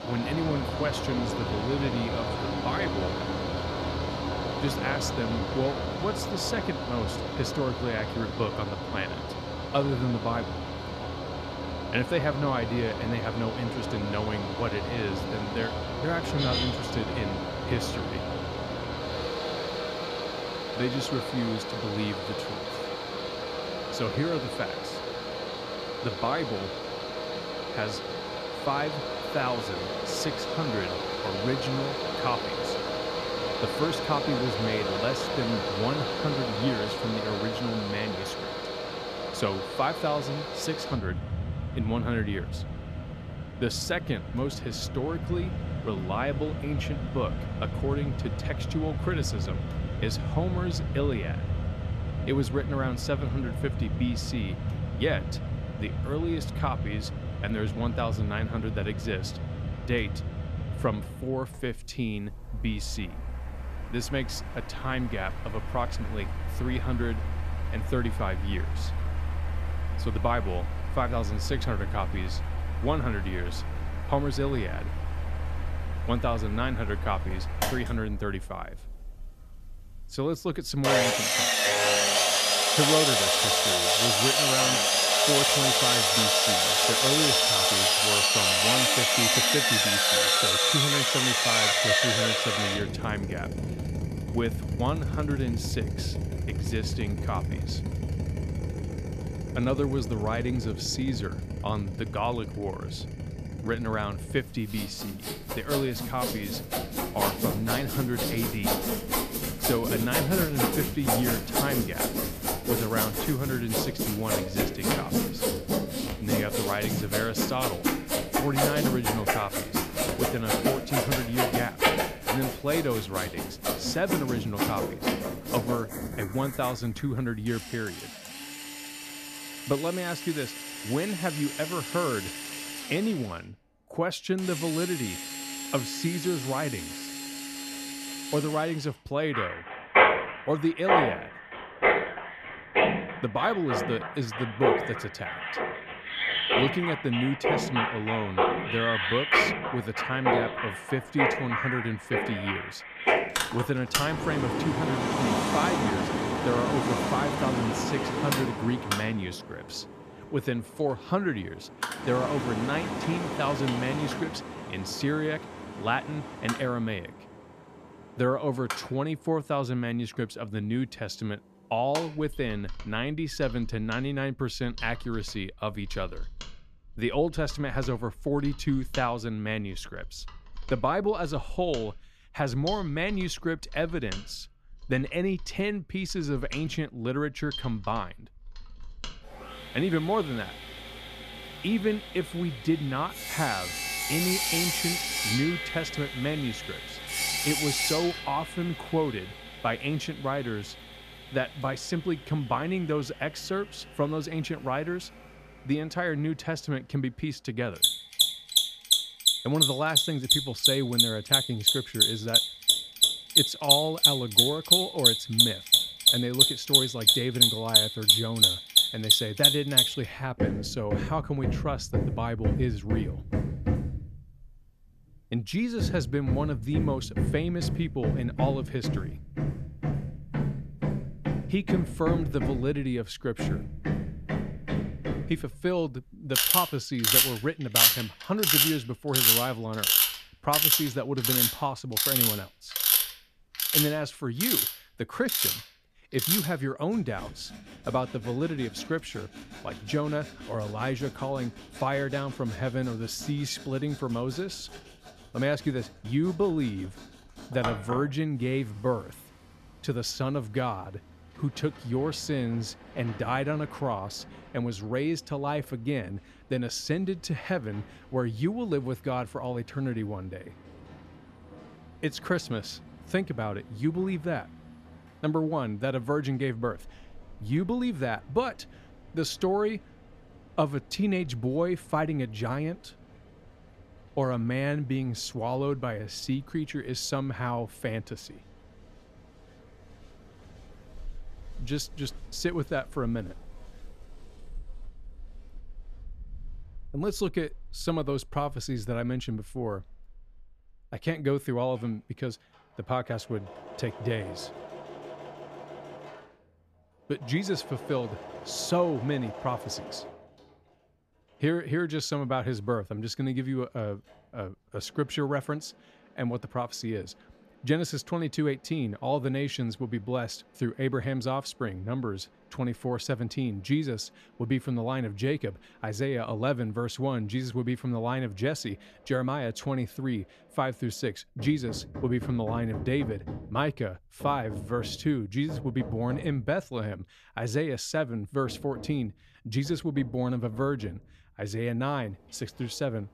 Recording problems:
machinery noise; very loud; throughout; 4 dB above the speech

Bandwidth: 14.5 kHz